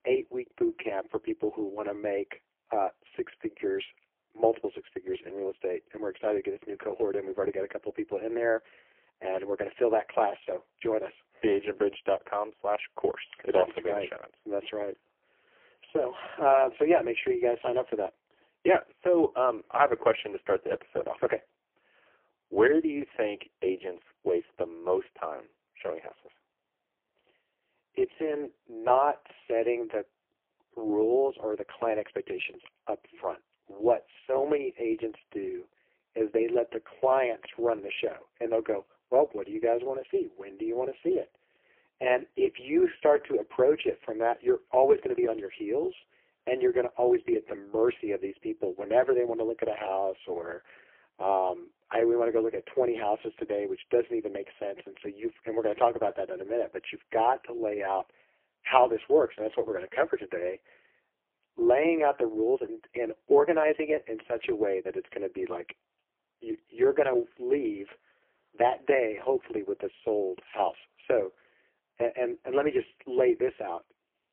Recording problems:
phone-call audio; poor line; nothing above 3 kHz

